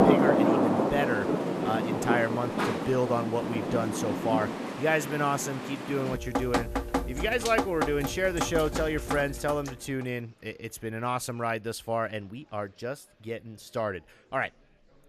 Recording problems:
rain or running water; very loud; until 9.5 s; 1 dB above the speech
murmuring crowd; faint; throughout; 30 dB below the speech

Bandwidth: 14 kHz